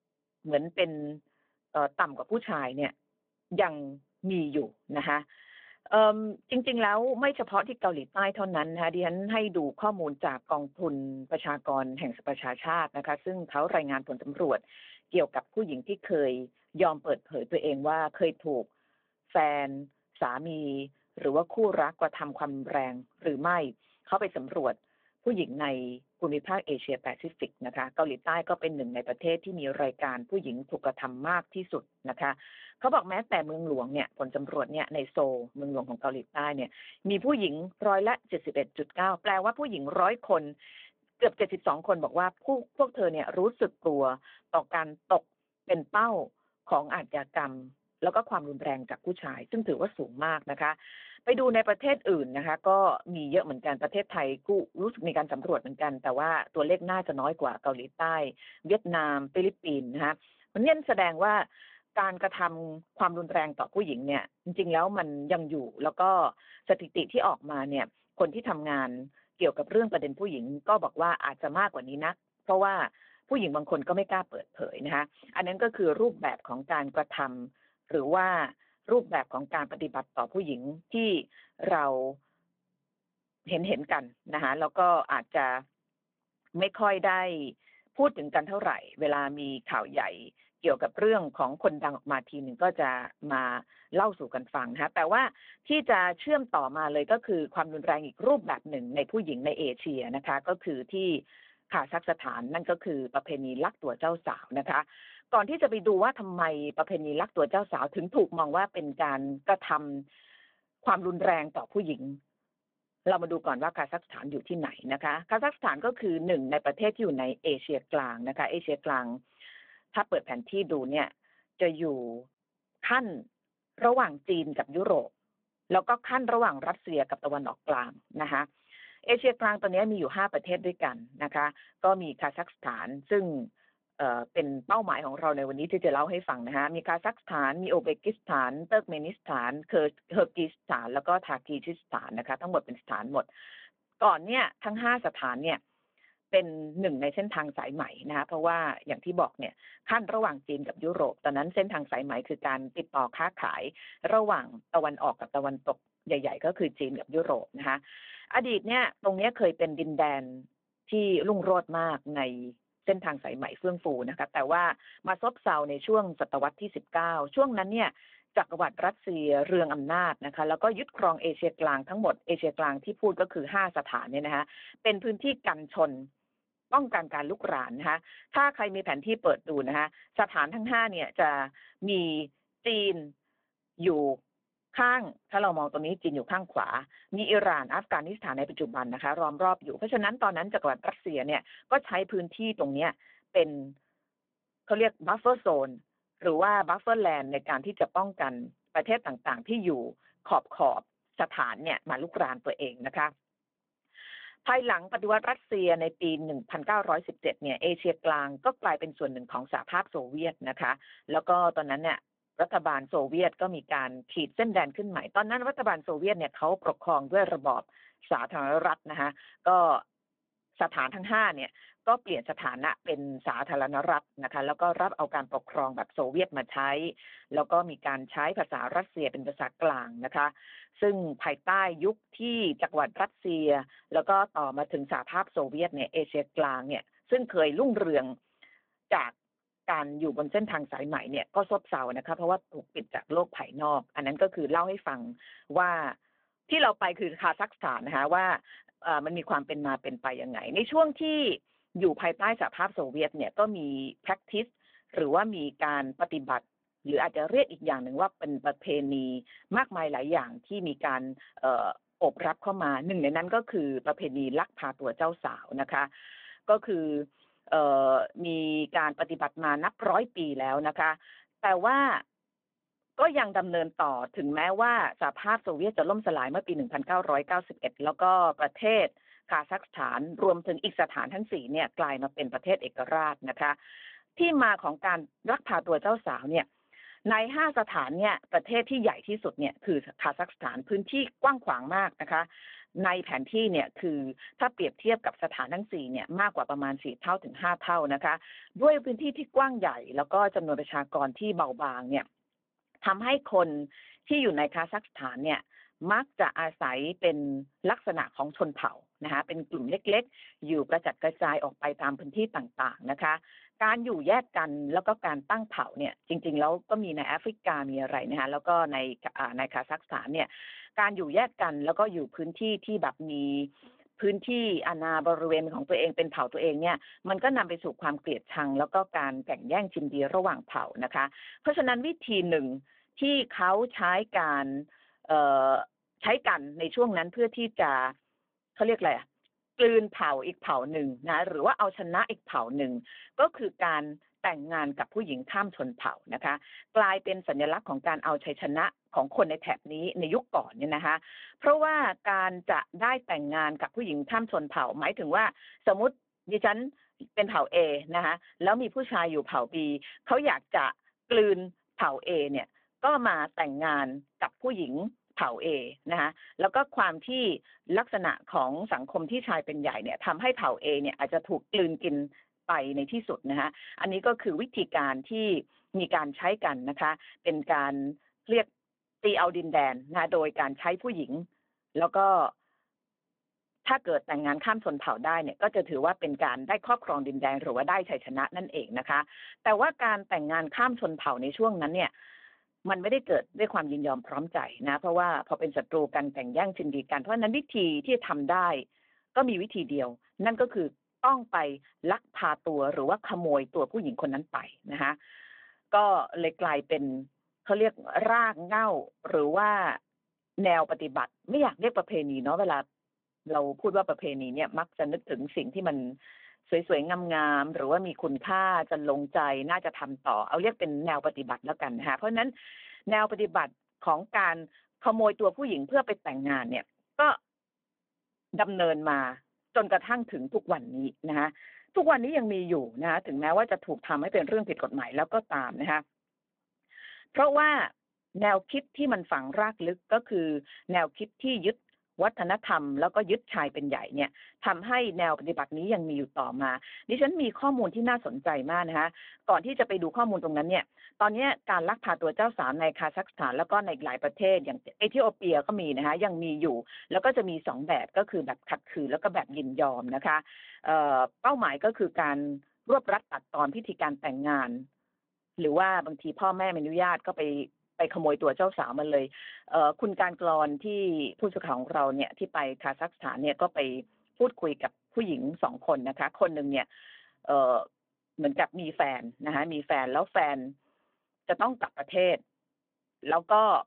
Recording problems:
phone-call audio

